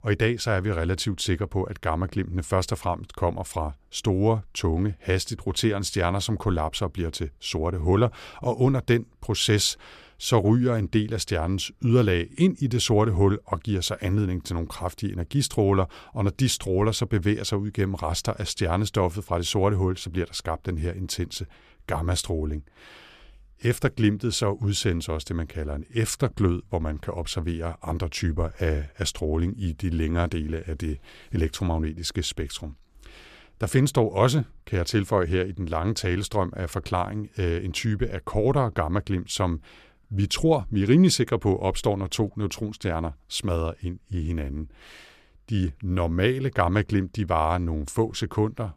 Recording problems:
none

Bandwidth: 14.5 kHz